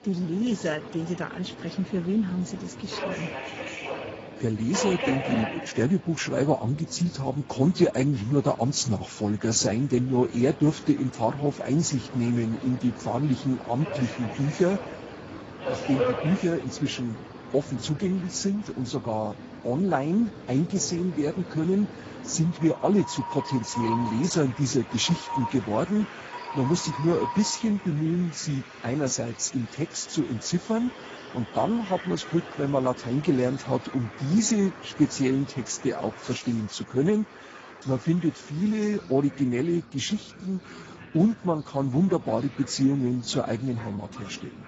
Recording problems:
garbled, watery; badly; nothing above 7.5 kHz
train or aircraft noise; noticeable; throughout; 10 dB below the speech

